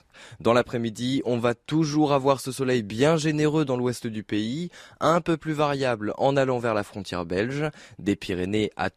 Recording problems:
none

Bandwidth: 14.5 kHz